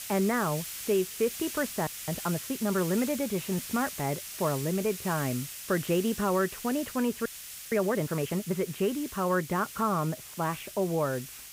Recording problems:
muffled; very; fading above 2.5 kHz
hiss; loud; throughout; 8 dB below the speech
audio freezing; at 2 s and at 7.5 s

